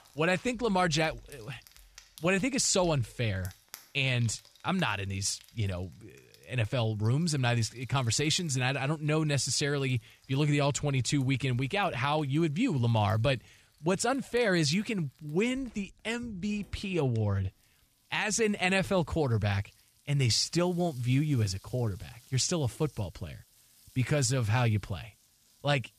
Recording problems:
household noises; faint; throughout; 25 dB below the speech

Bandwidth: 14.5 kHz